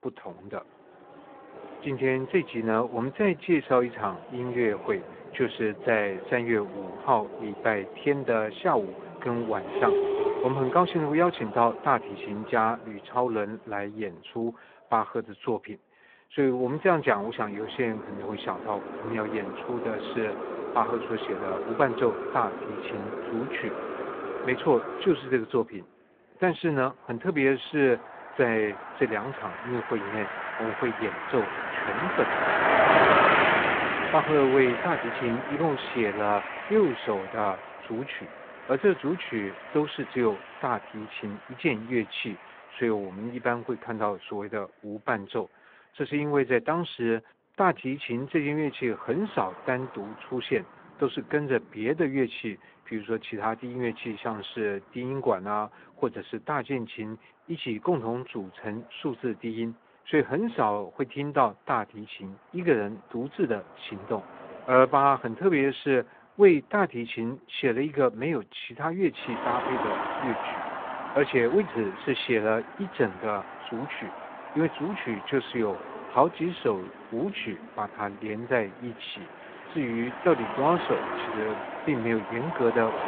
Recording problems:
phone-call audio
traffic noise; loud; throughout; 3 dB below the speech

